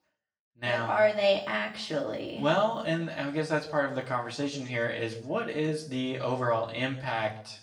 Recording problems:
off-mic speech; far
room echo; slight; dies away in 0.7 s

